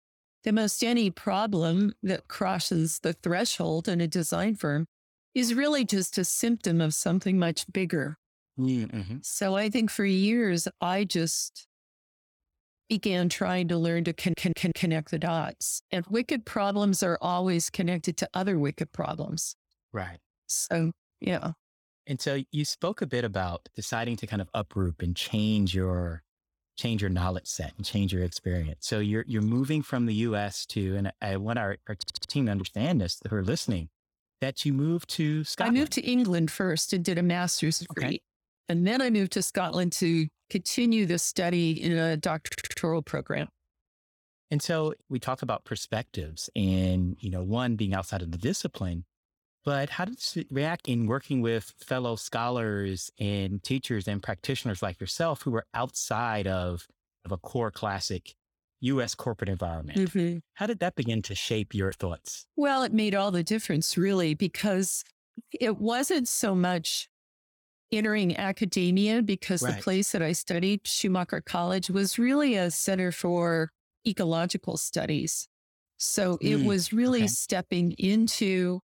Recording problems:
audio stuttering; at 14 s, at 32 s and at 42 s

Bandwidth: 18.5 kHz